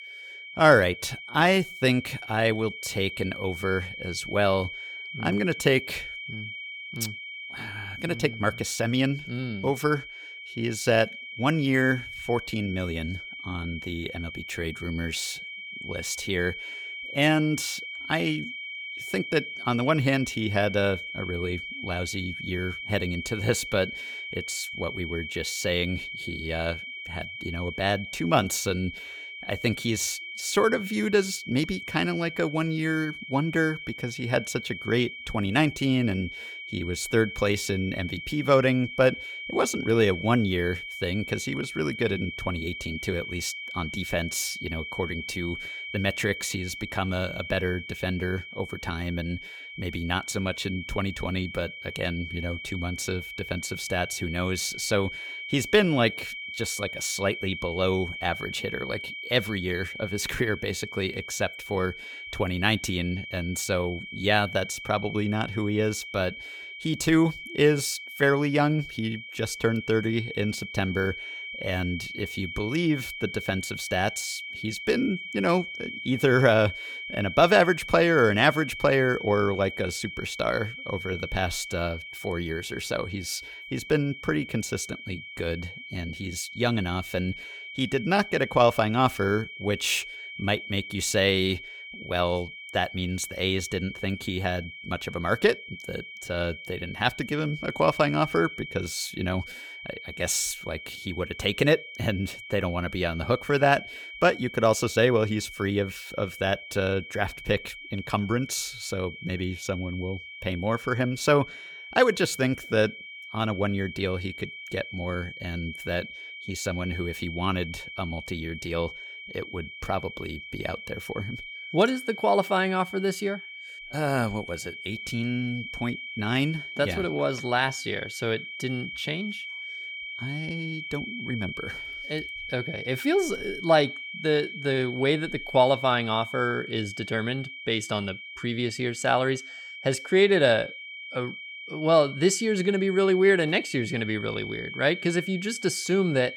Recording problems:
high-pitched whine; loud; throughout; 2.5 kHz, 10 dB below the speech

